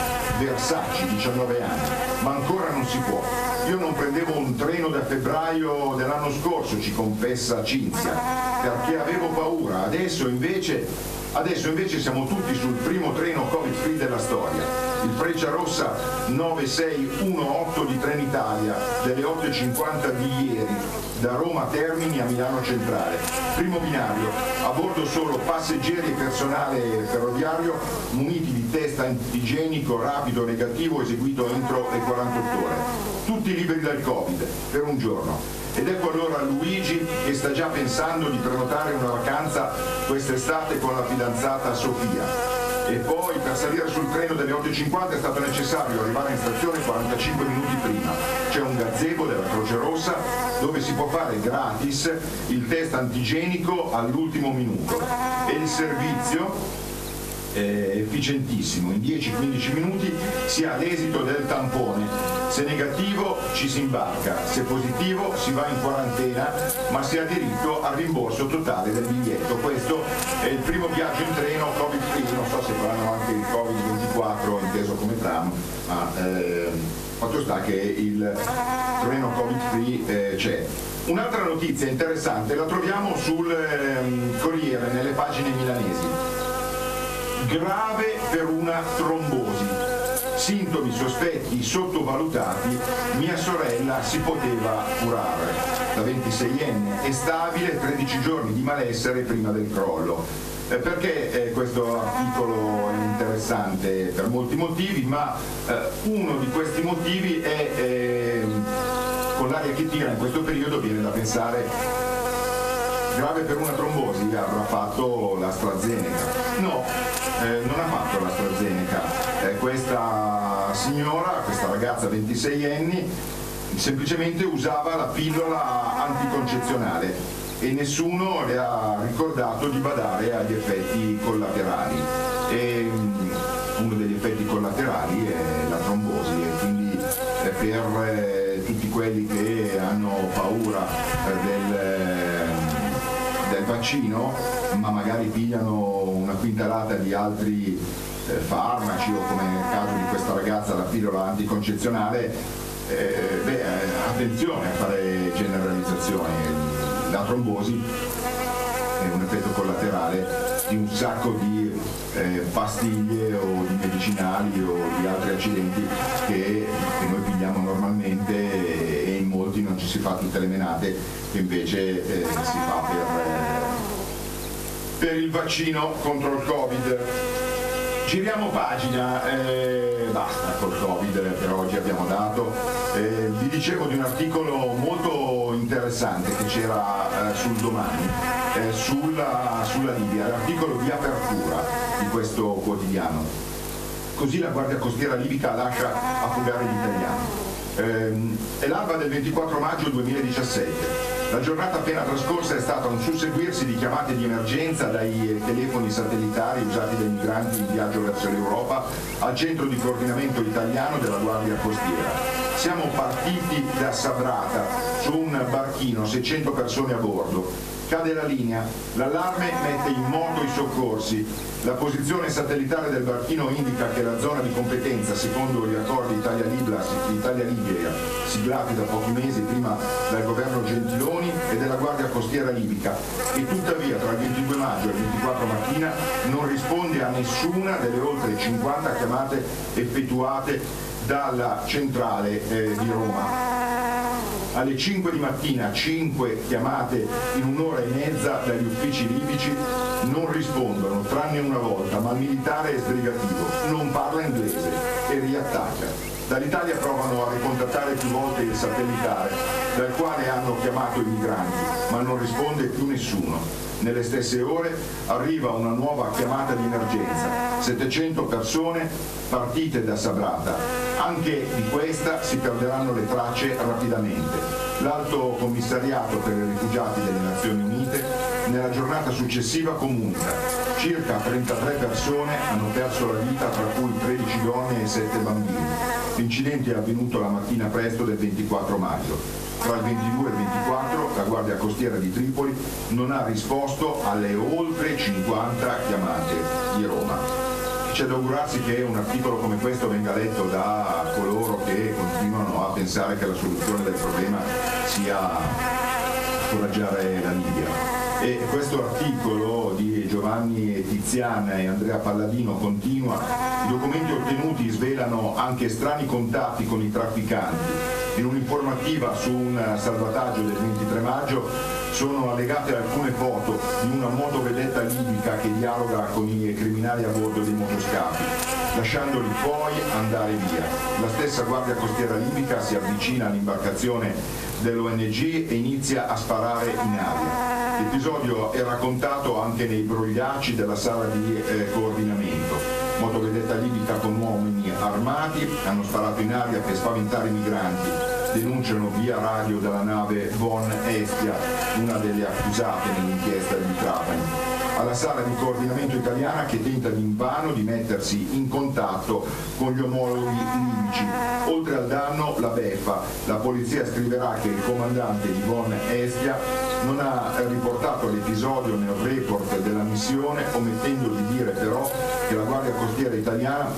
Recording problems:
off-mic speech; far
room echo; slight; dies away in 0.3 s
squashed, flat; somewhat
electrical hum; loud; throughout; 50 Hz, 4 dB below the speech

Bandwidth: 14.5 kHz